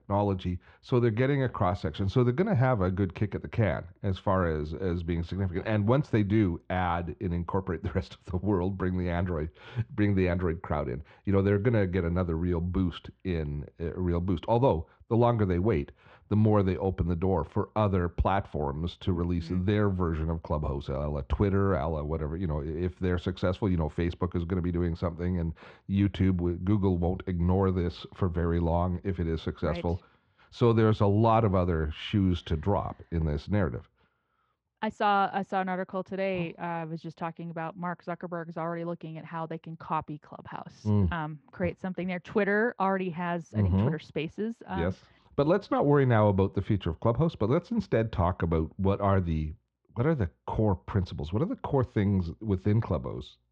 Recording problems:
muffled; very; fading above 2 kHz

